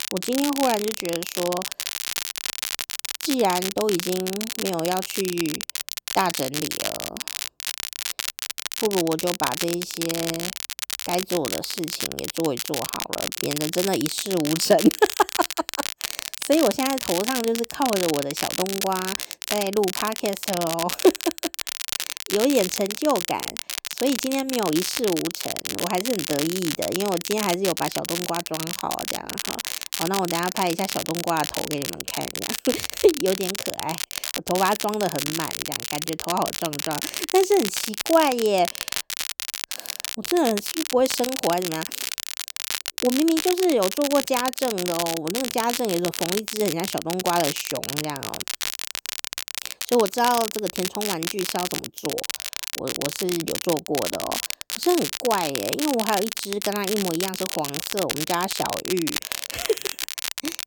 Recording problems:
crackle, like an old record; loud; 3 dB below the speech

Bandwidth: 18.5 kHz